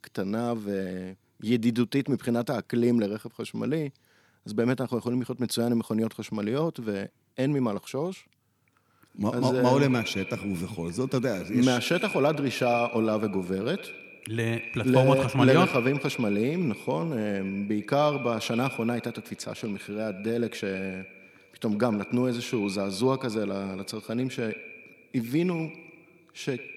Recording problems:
echo of what is said; strong; from 9 s on; 100 ms later, 10 dB below the speech

